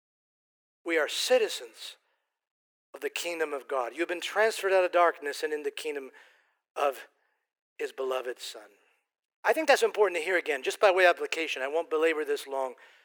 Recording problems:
thin; very; fading below 350 Hz

